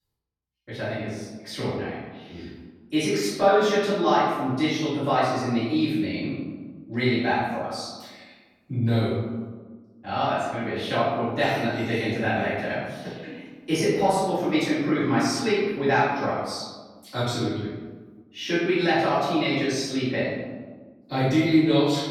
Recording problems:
room echo; strong; dies away in 1.3 s
off-mic speech; far

